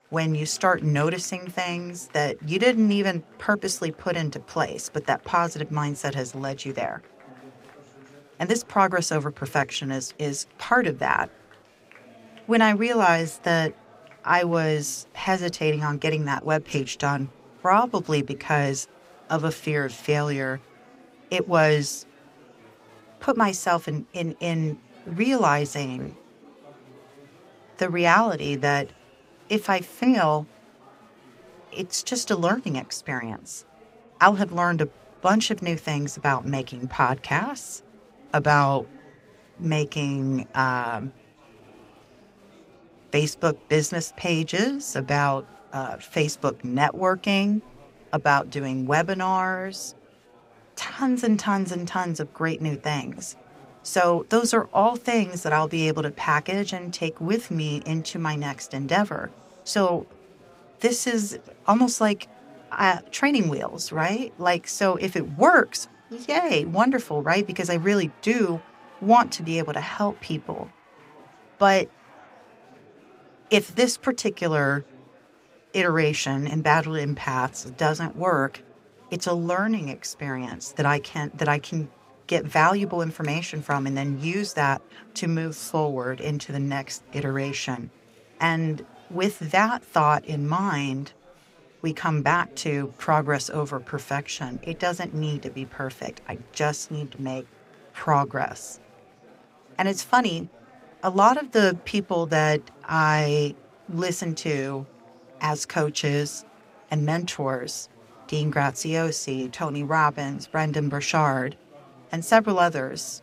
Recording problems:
chatter from many people; faint; throughout; 25 dB below the speech

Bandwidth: 15.5 kHz